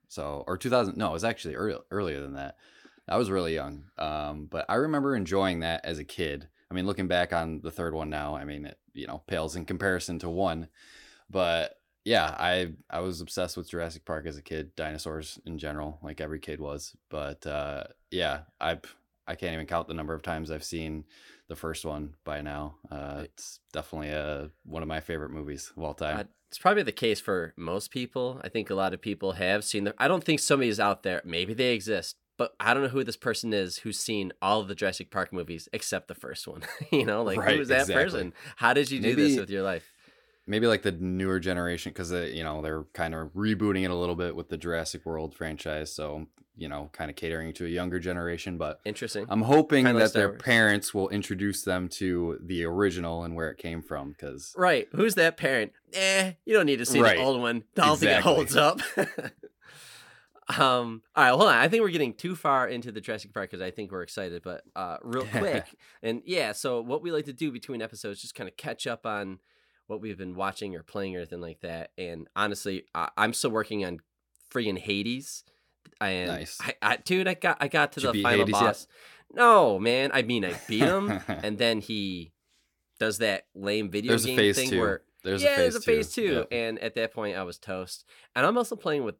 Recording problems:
none

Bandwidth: 17.5 kHz